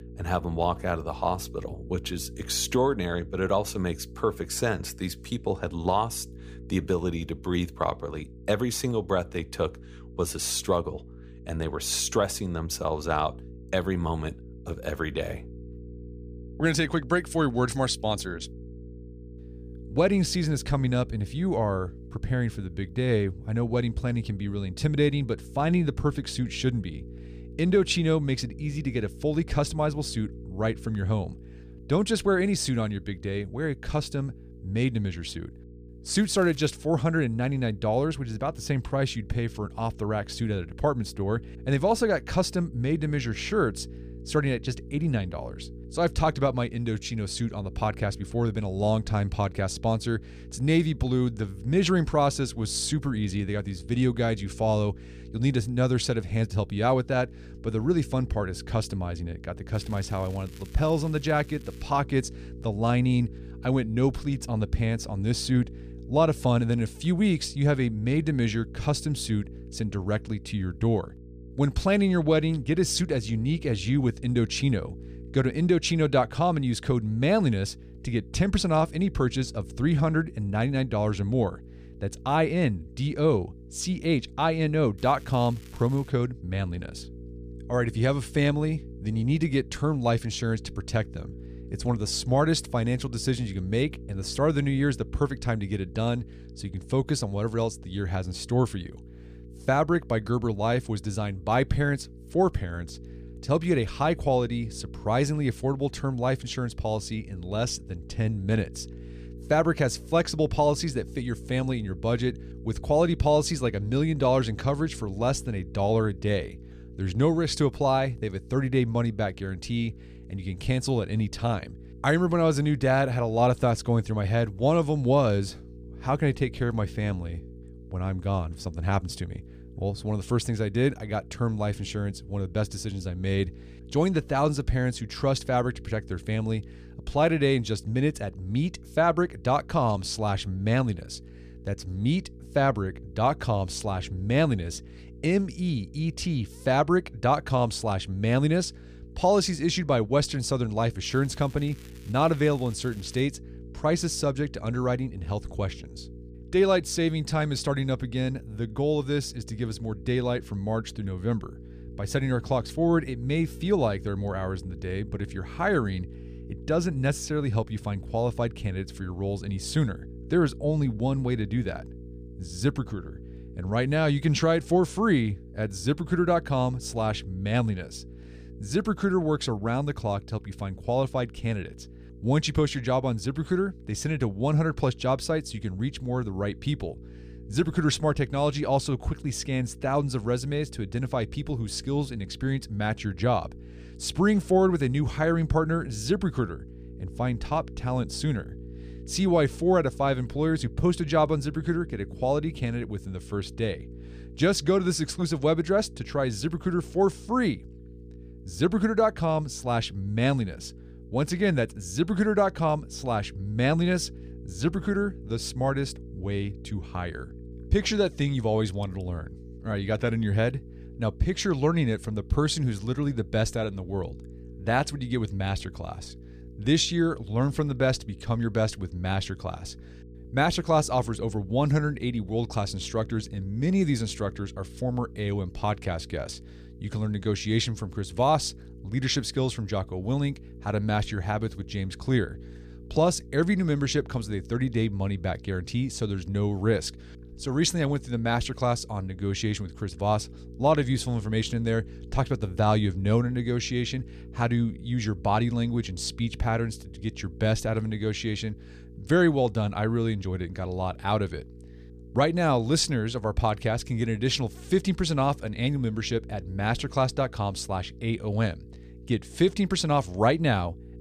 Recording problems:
electrical hum; faint; throughout; 60 Hz, 25 dB below the speech
crackling; faint; 4 times, first at 36 s; 25 dB below the speech

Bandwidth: 15 kHz